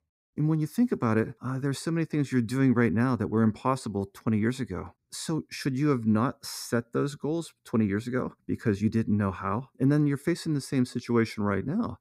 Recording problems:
none

